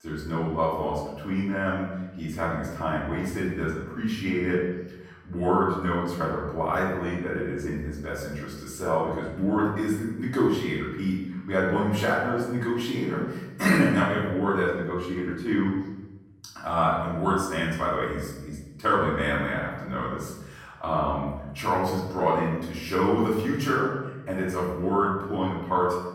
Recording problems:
off-mic speech; far
room echo; noticeable; dies away in 1 s

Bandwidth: 16.5 kHz